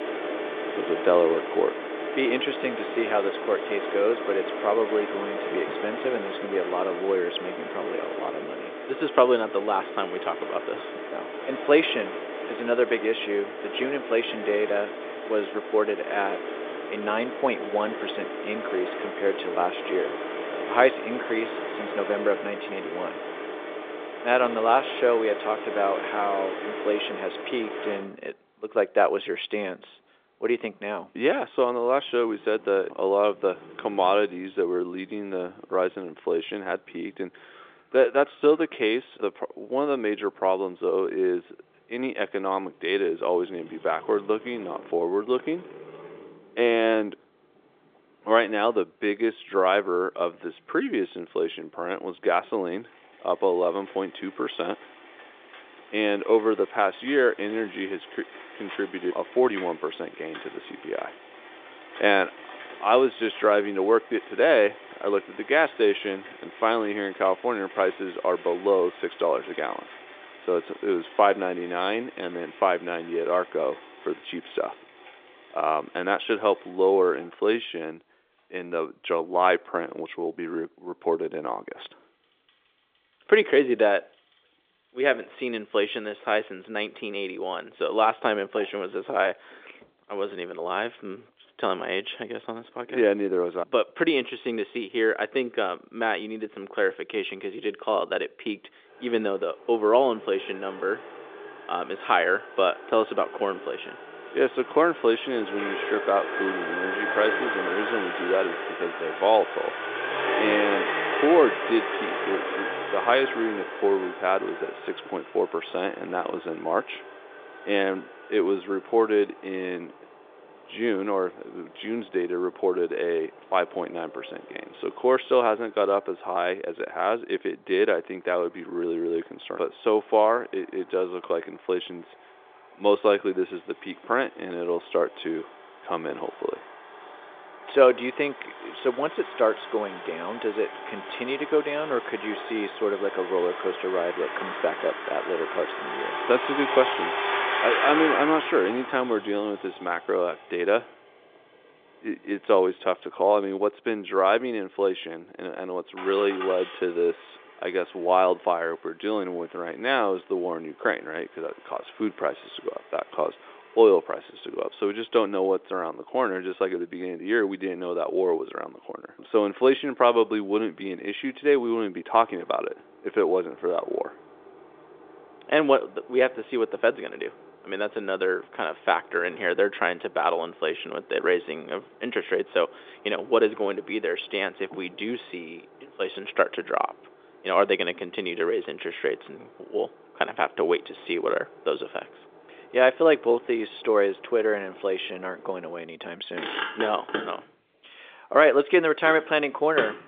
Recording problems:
phone-call audio; nothing above 3.5 kHz
traffic noise; loud; throughout; 8 dB below the speech

